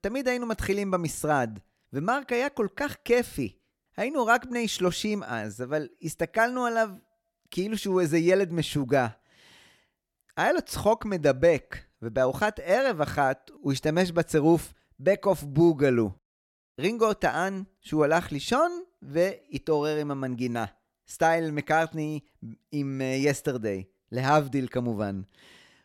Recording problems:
none

